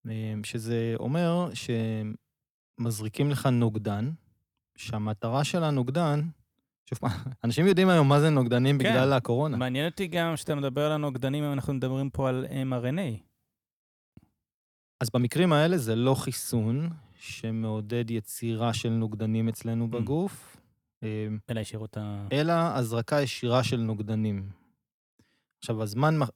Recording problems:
uneven, jittery; strongly; from 2.5 to 22 s

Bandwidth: 19 kHz